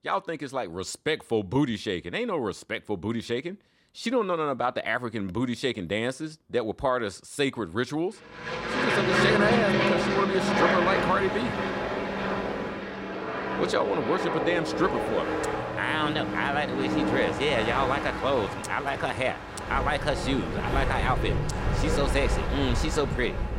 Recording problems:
train or aircraft noise; very loud; from 9 s on; as loud as the speech

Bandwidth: 16.5 kHz